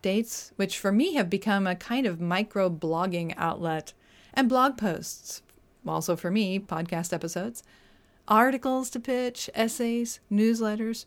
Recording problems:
none

